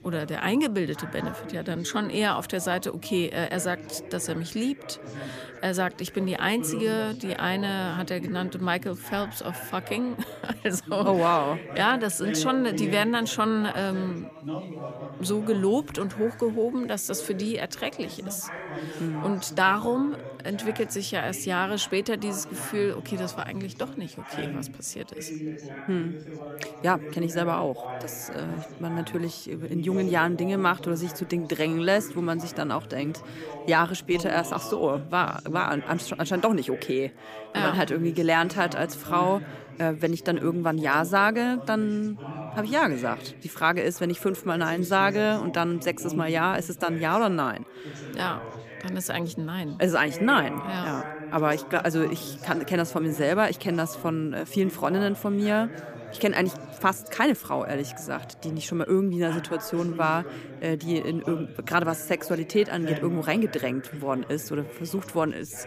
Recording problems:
background chatter; noticeable; throughout; 4 voices, 10 dB below the speech

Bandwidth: 15 kHz